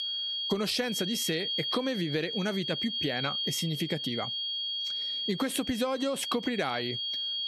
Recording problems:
squashed, flat; somewhat
high-pitched whine; loud; throughout; 3.5 kHz, 1 dB below the speech

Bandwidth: 13.5 kHz